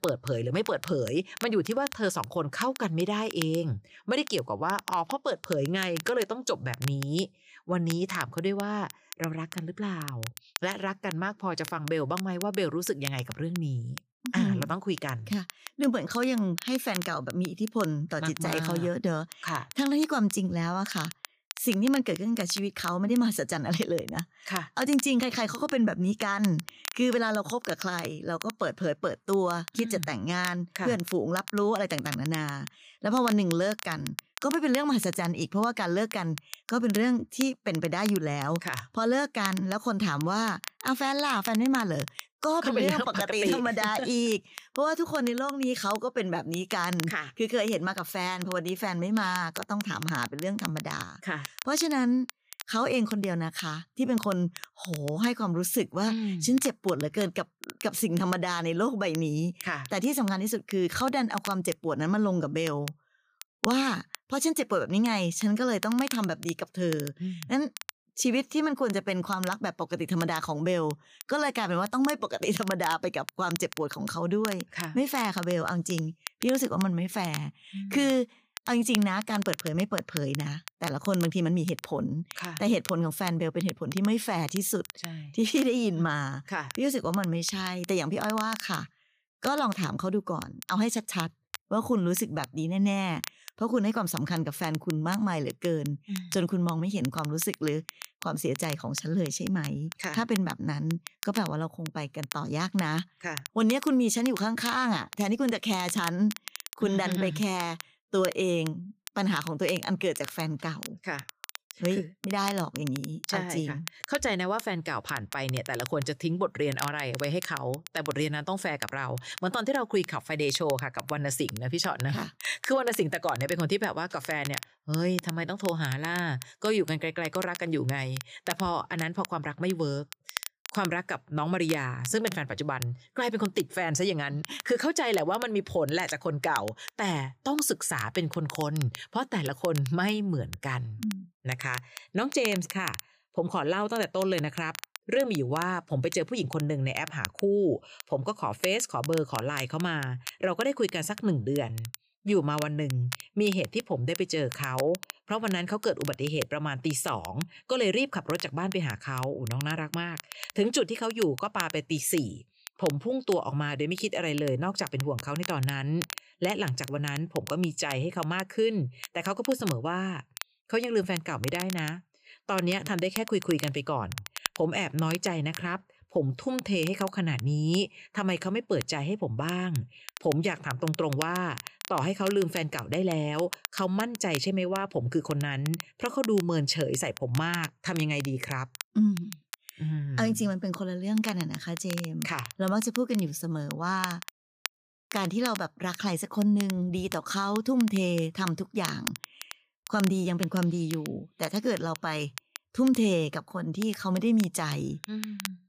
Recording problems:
crackle, like an old record; noticeable; 10 dB below the speech

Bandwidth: 15 kHz